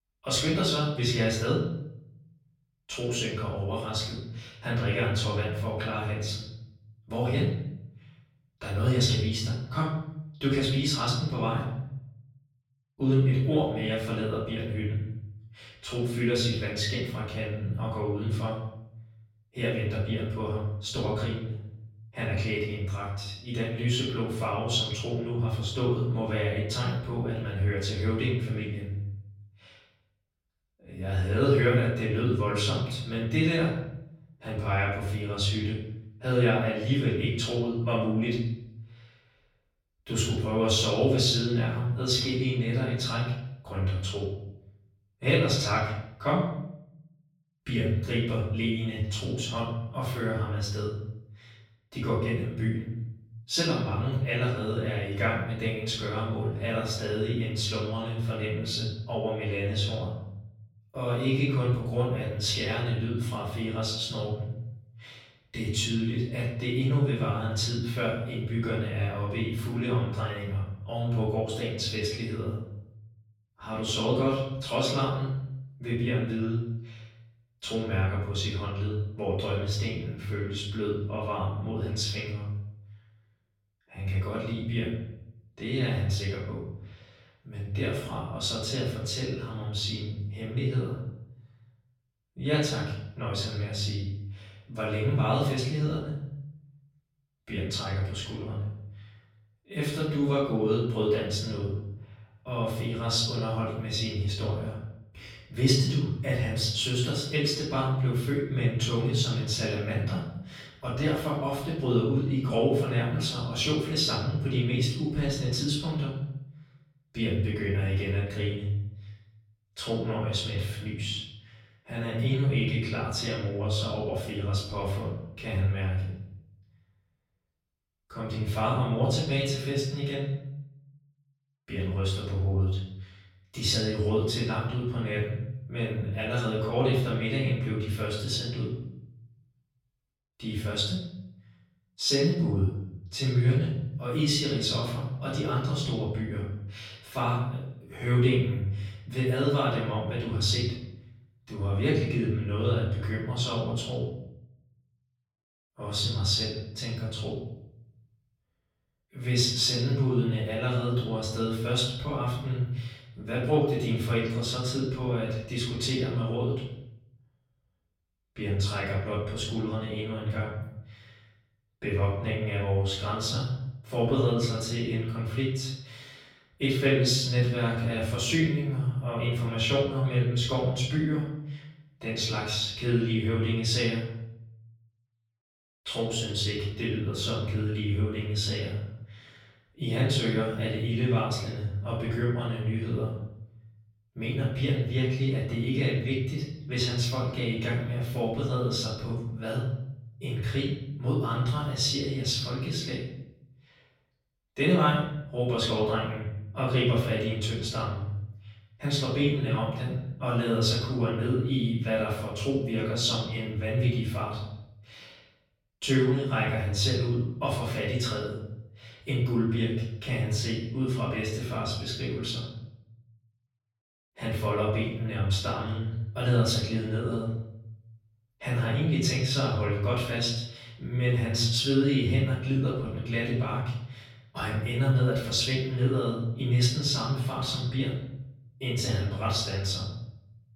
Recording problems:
off-mic speech; far
room echo; noticeable; dies away in 0.8 s

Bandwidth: 16.5 kHz